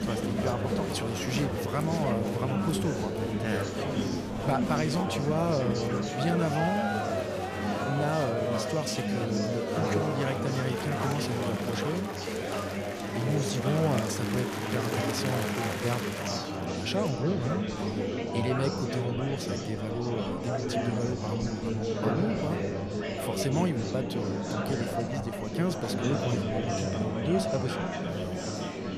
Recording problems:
murmuring crowd; very loud; throughout; 1 dB above the speech
household noises; faint; throughout; 25 dB below the speech

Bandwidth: 14.5 kHz